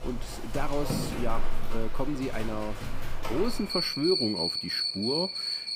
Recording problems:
animal sounds; very loud; throughout; 1 dB above the speech

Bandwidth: 15.5 kHz